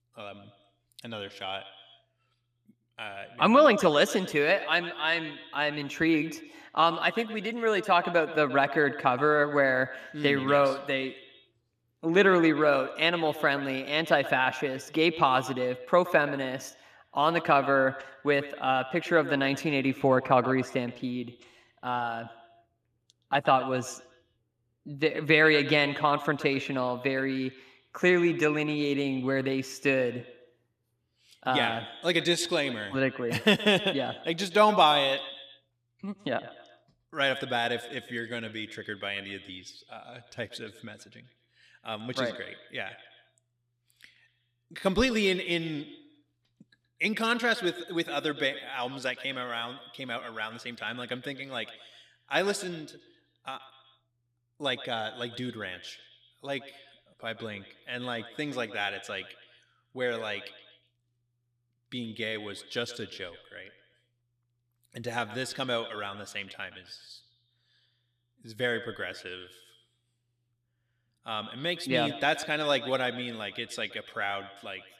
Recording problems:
echo of what is said; noticeable; throughout; 120 ms later, 15 dB below the speech

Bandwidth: 15 kHz